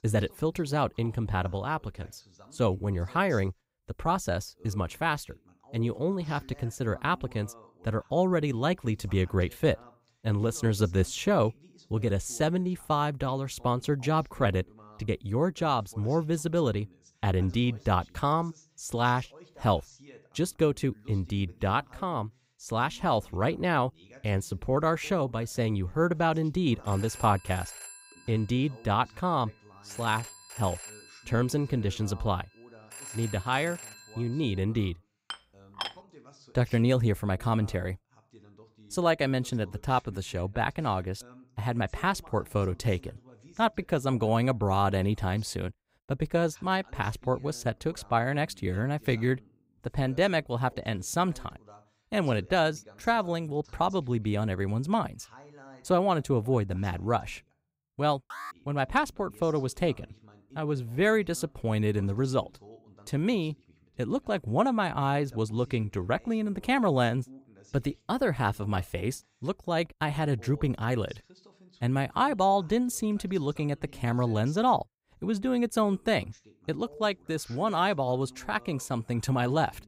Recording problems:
voice in the background; faint; throughout; 25 dB below the speech
phone ringing; faint; from 27 to 35 s; peak 10 dB below the speech
clattering dishes; noticeable; at 35 s; peak 8 dB below the speech
alarm; faint; at 58 s; peak 10 dB below the speech

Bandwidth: 15.5 kHz